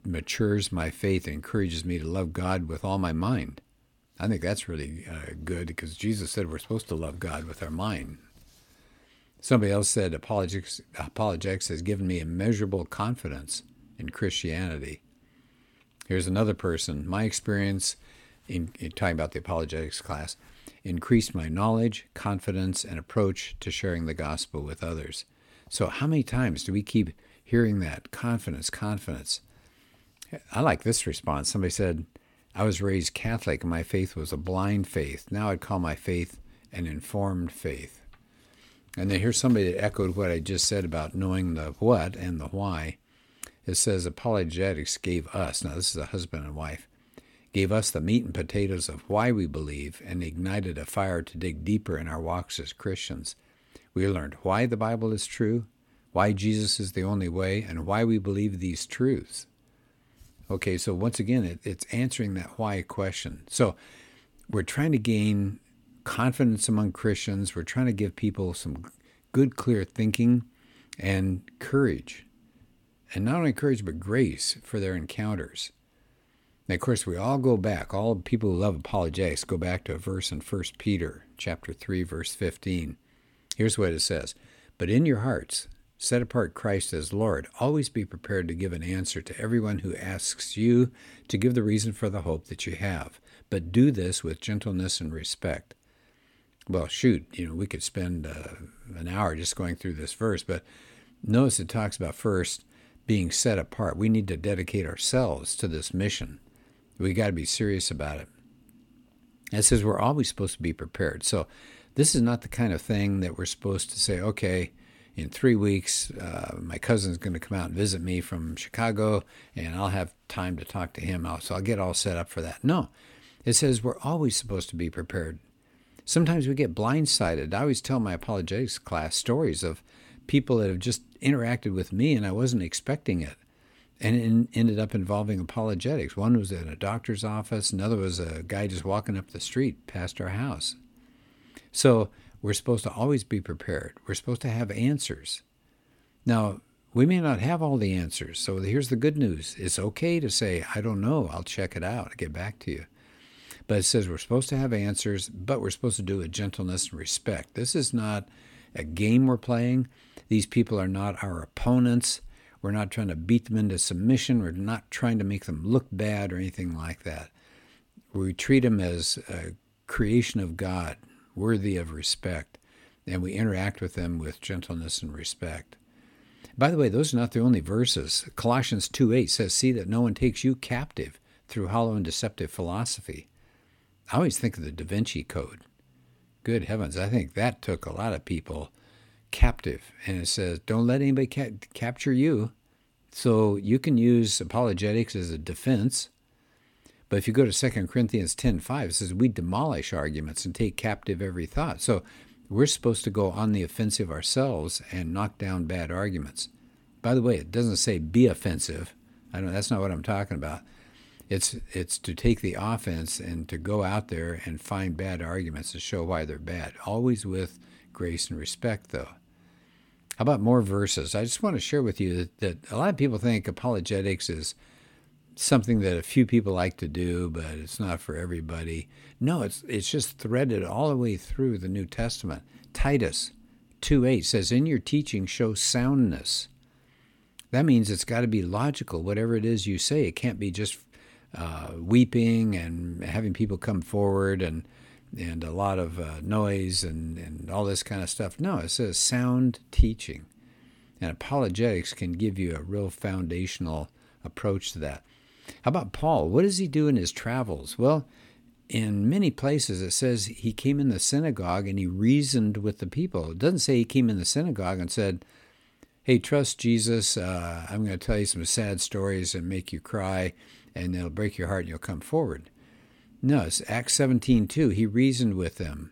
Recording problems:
none

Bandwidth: 17 kHz